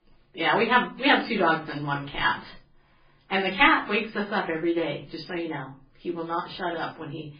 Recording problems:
off-mic speech; far
garbled, watery; badly
room echo; very slight; dies away in 0.3 s

